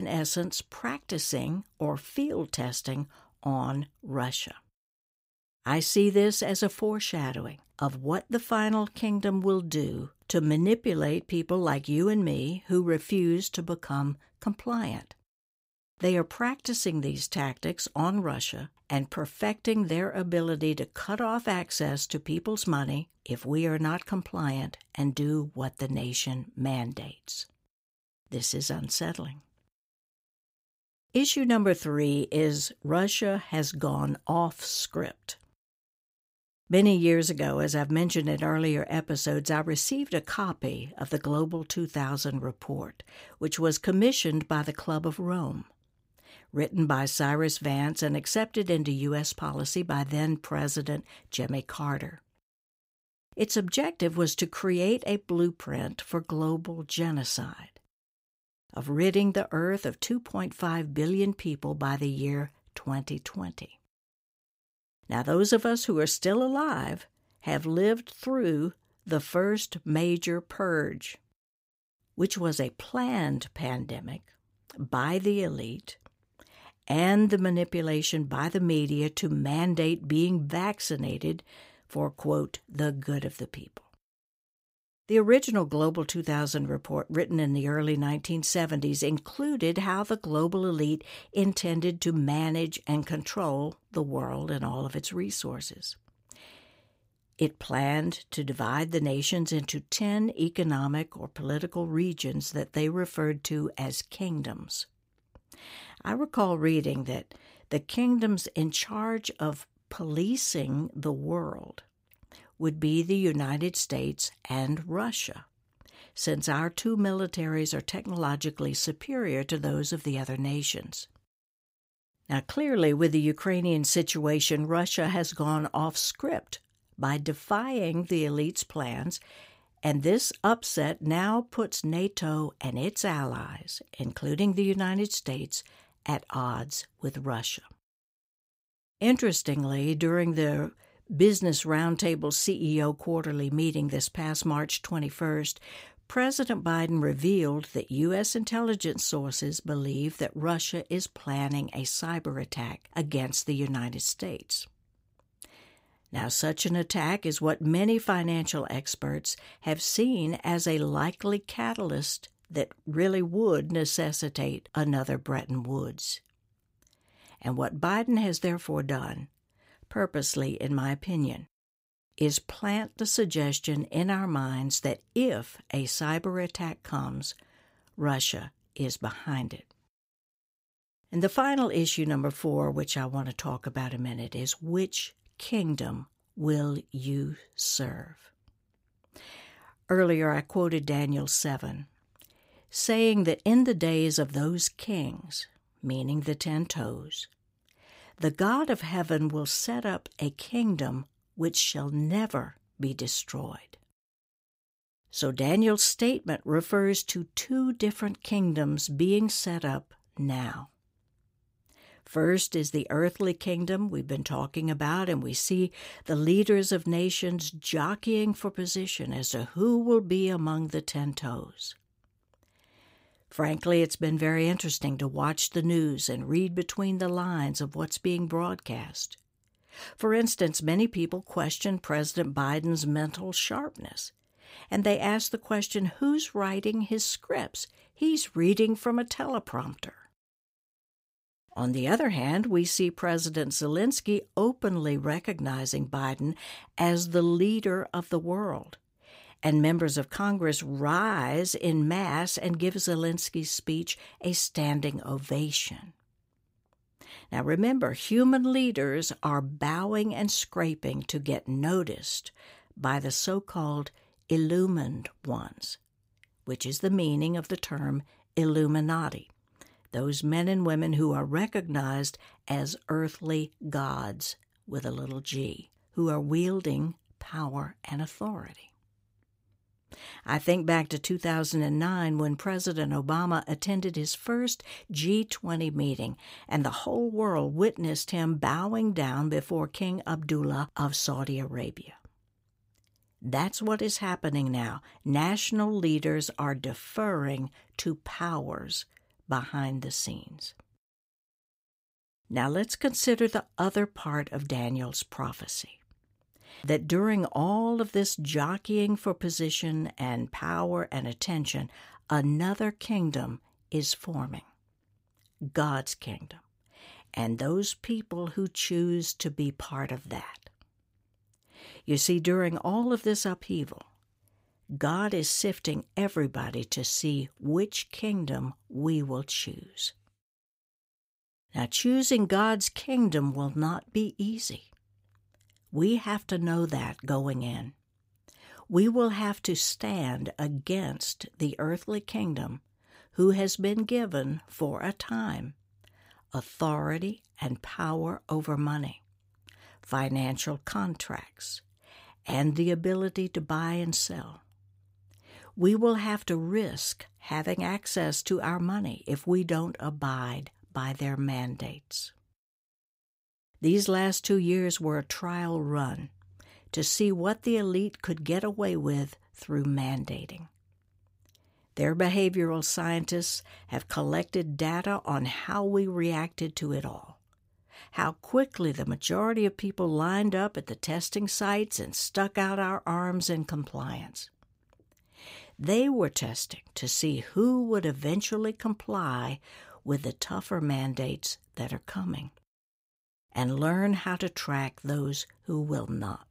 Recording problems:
abrupt cut into speech; at the start

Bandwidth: 15.5 kHz